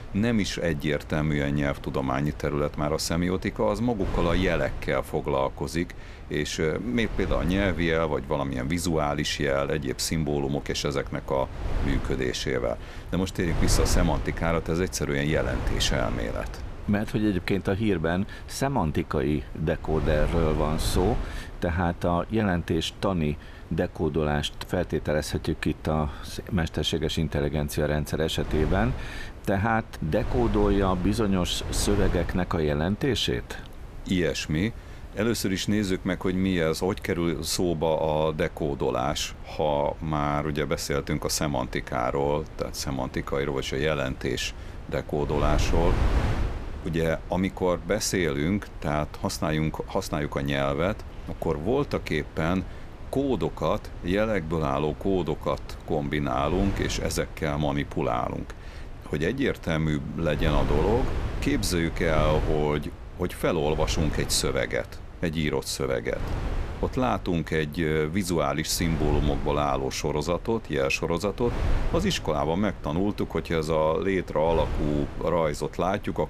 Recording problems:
wind noise on the microphone; occasional gusts; 15 dB below the speech

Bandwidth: 14.5 kHz